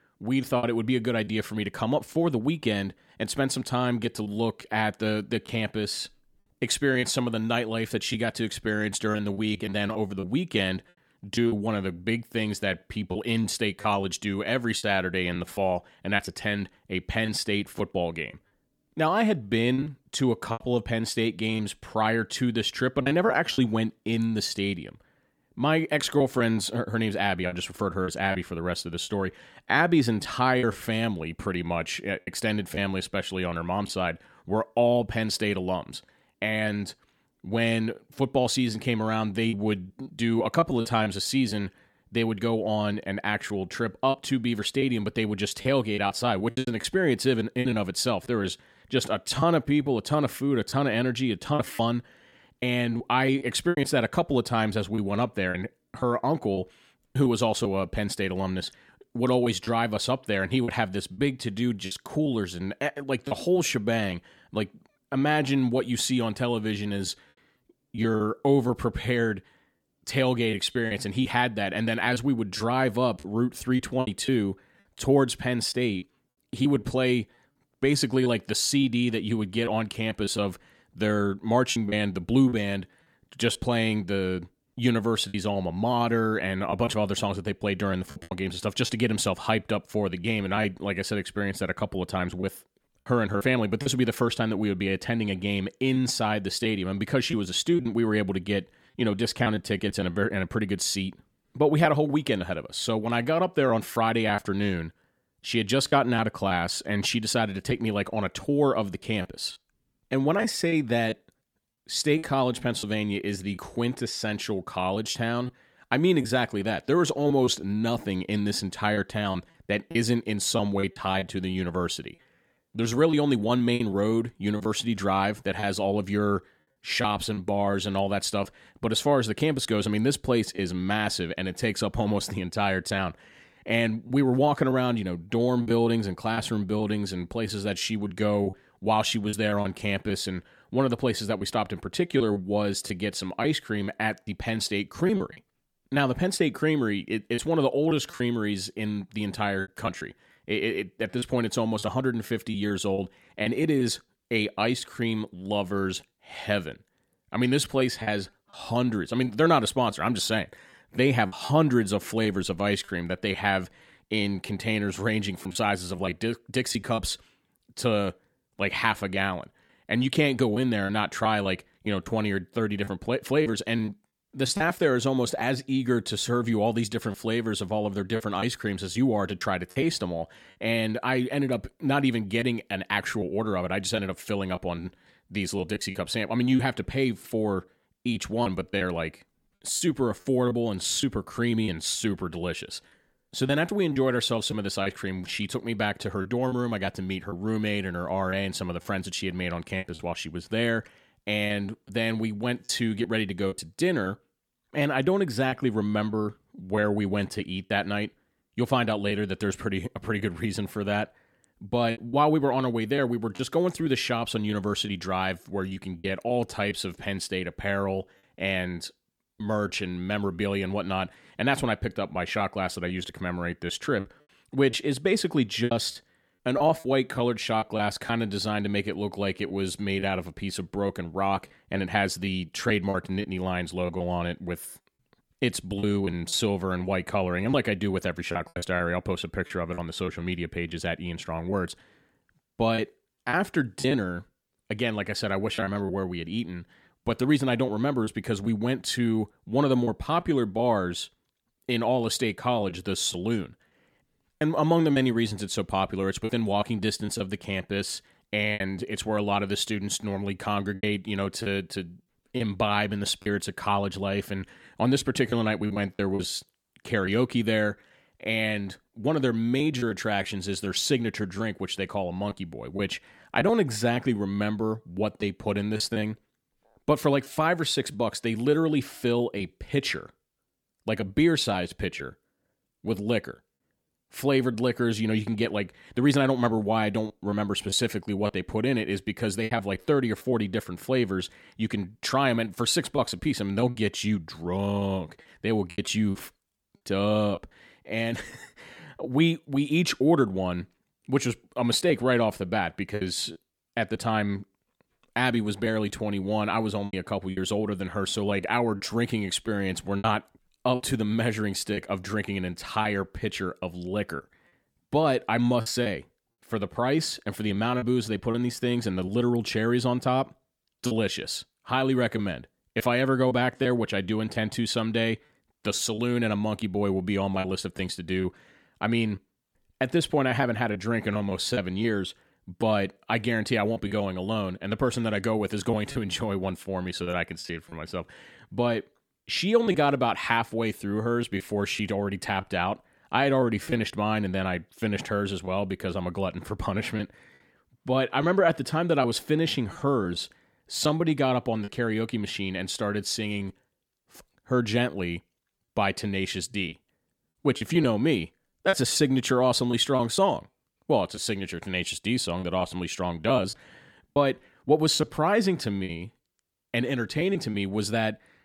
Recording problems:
choppy; very; 5% of the speech affected

